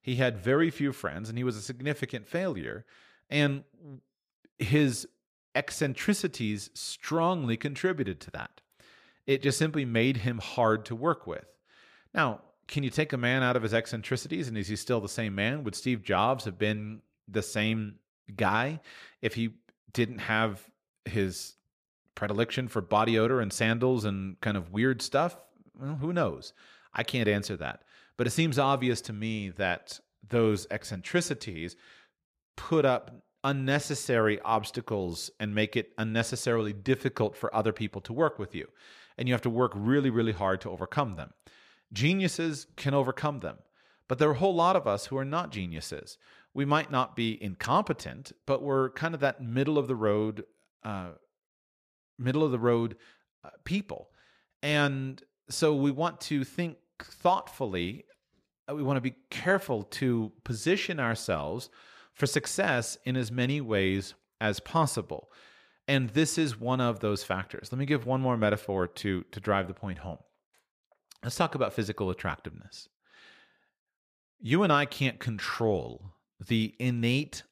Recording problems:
none

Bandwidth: 14.5 kHz